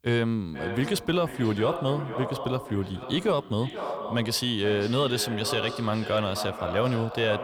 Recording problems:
echo of what is said; strong; throughout; 490 ms later, 9 dB below the speech

